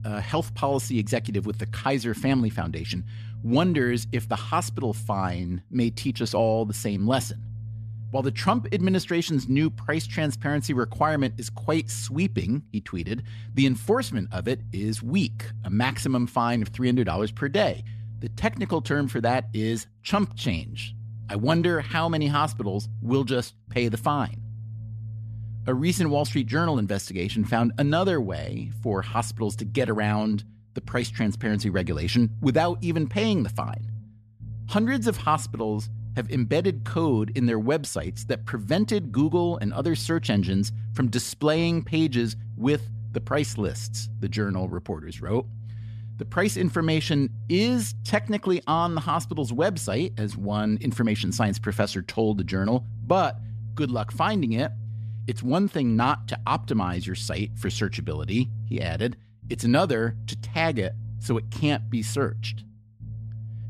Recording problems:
low rumble; faint; throughout; 20 dB below the speech

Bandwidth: 14.5 kHz